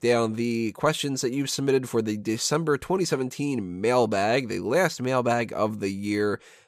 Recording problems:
none

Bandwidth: 14.5 kHz